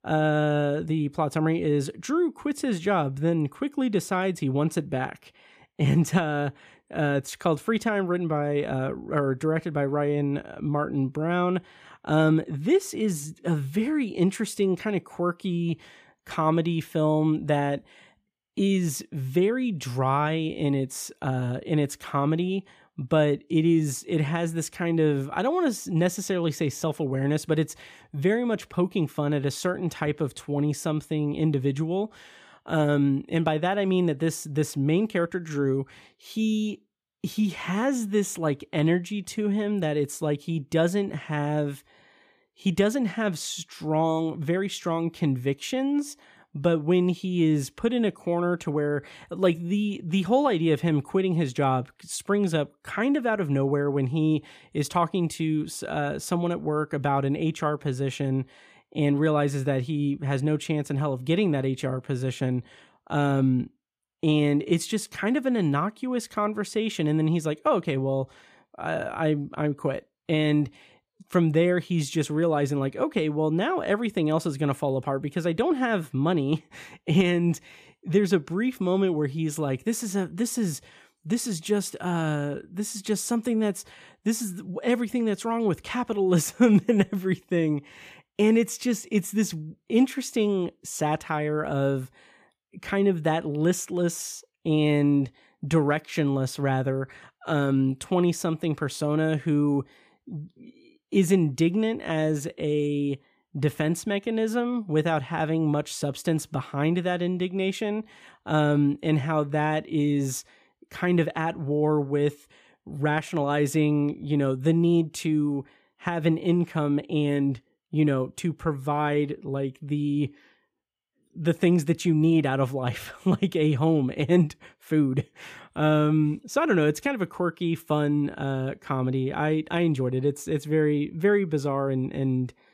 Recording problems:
none

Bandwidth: 15 kHz